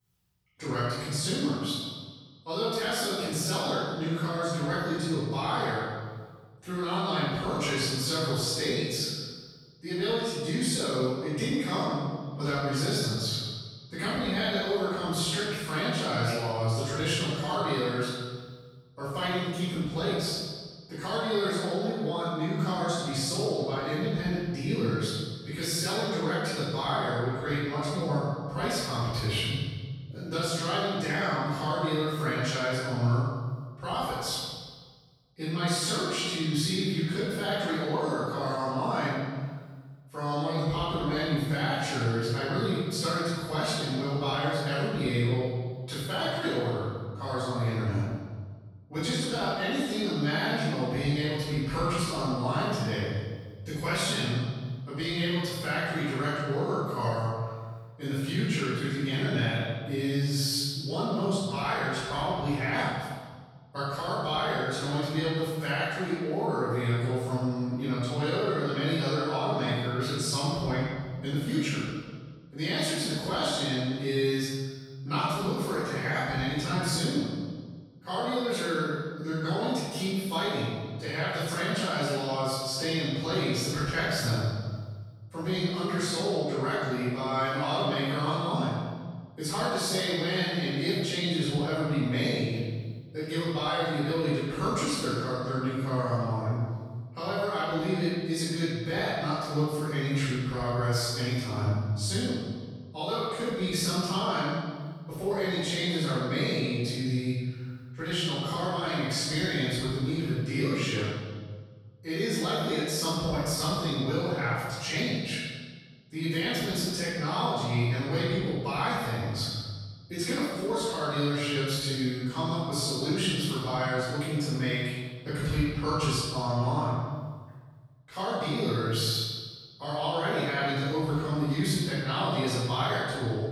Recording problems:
room echo; strong; dies away in 1.5 s
off-mic speech; far

